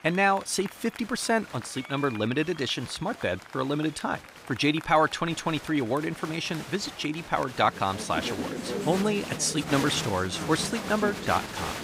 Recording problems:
crowd noise; loud; throughout; 10 dB below the speech

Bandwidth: 15.5 kHz